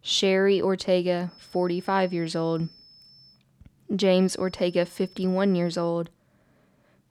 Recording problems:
high-pitched whine; faint; from 1.5 to 3.5 s and from 4 to 6 s; 5.5 kHz, 25 dB below the speech

